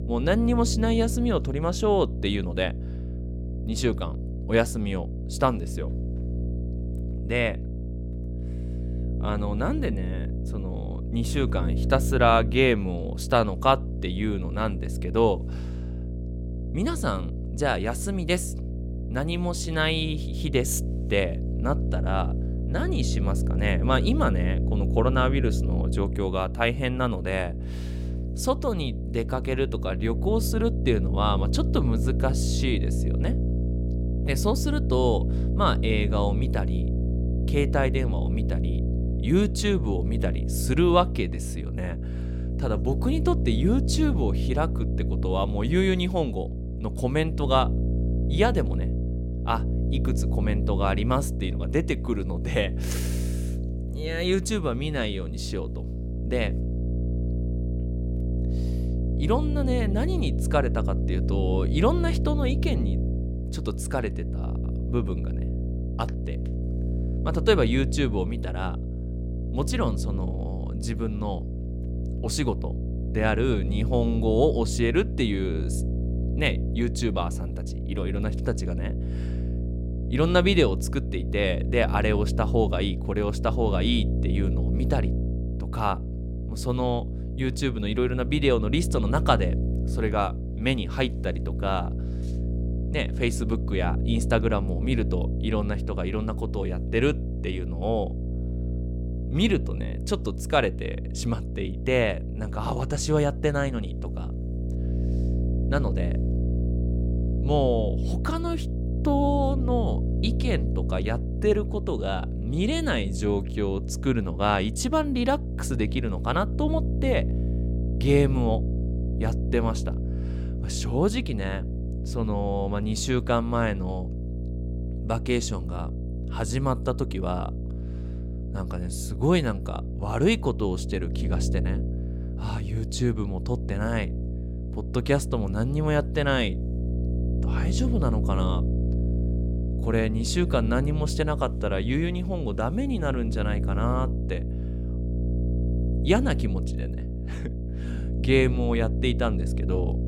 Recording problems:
electrical hum; noticeable; throughout; 60 Hz, 10 dB below the speech

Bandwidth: 16.5 kHz